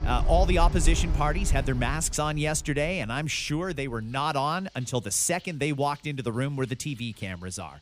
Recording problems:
rain or running water; loud; throughout; 3 dB below the speech

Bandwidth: 15 kHz